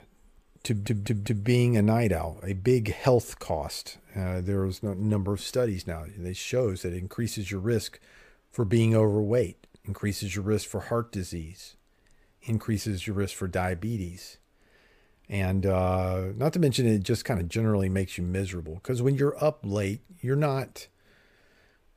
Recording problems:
audio stuttering; at 0.5 s

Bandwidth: 15 kHz